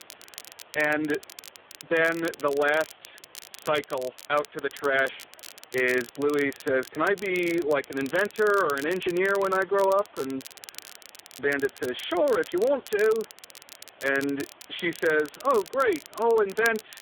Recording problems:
phone-call audio; poor line
crackle, like an old record; noticeable; 20 dB below the speech
hiss; faint; throughout; 30 dB below the speech

